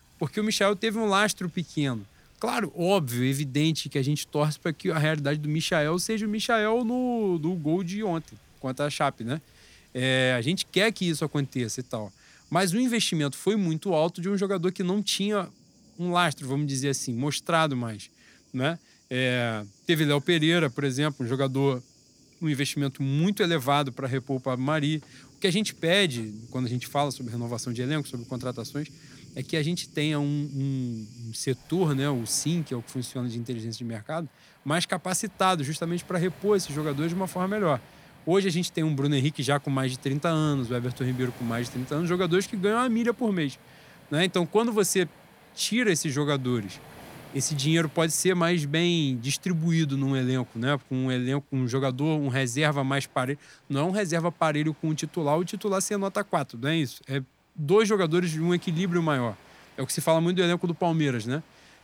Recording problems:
rain or running water; faint; throughout; 25 dB below the speech

